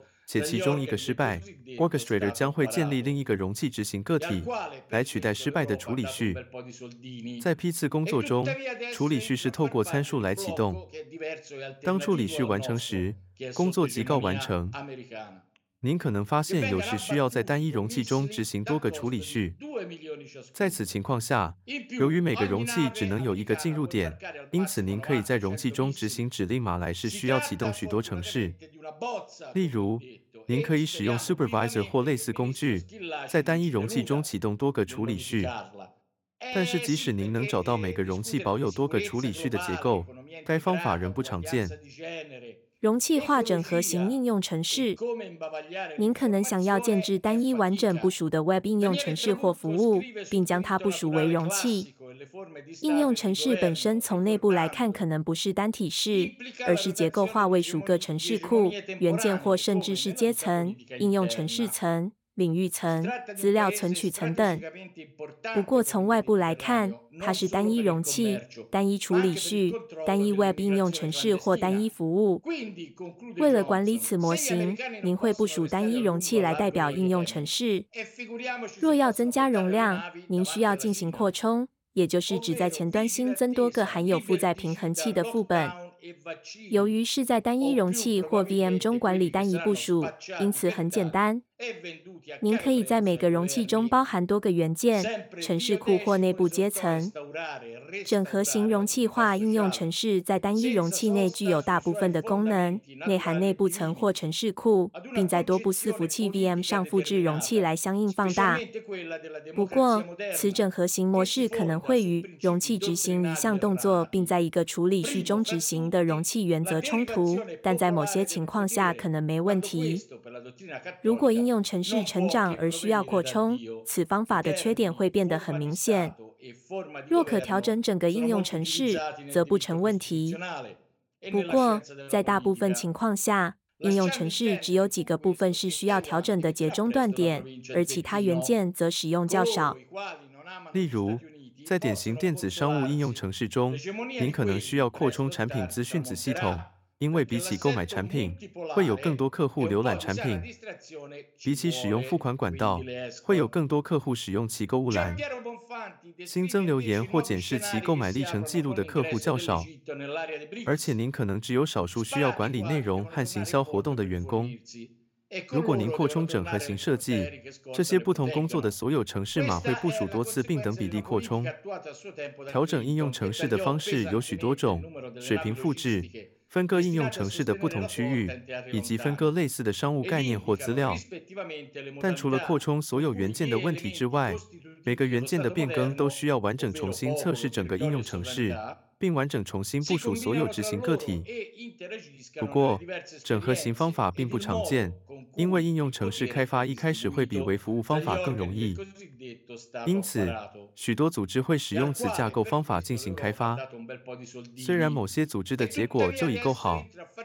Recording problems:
voice in the background; noticeable; throughout; 10 dB below the speech

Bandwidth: 17 kHz